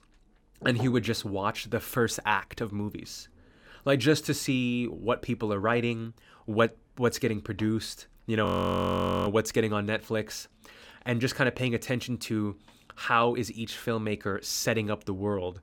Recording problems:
audio freezing; at 8.5 s for 1 s

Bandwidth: 17 kHz